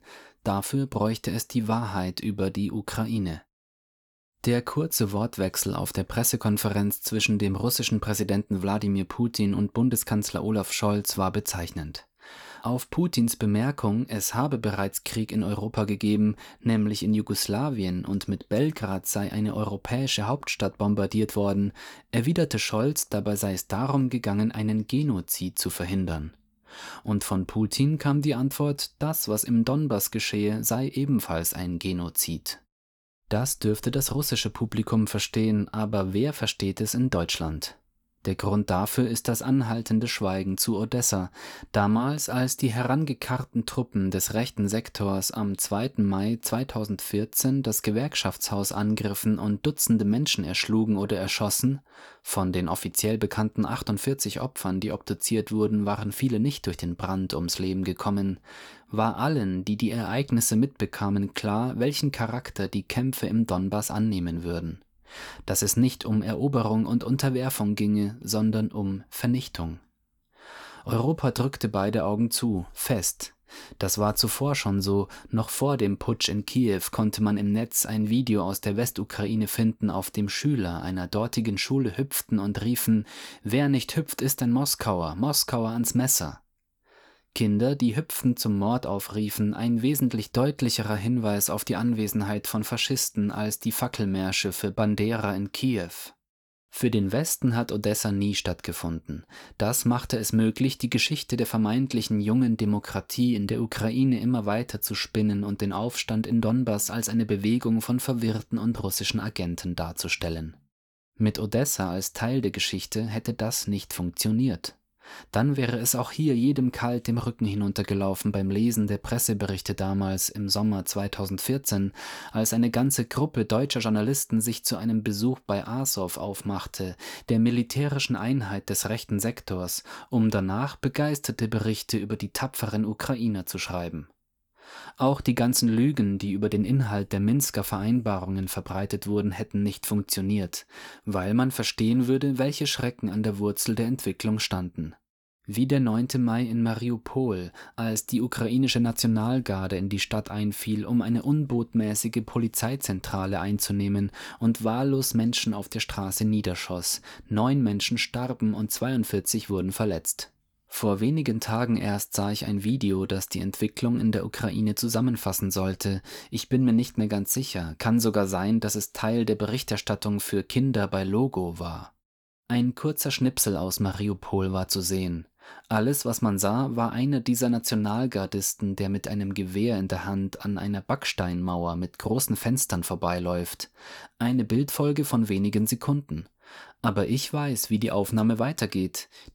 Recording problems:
none

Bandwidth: 19 kHz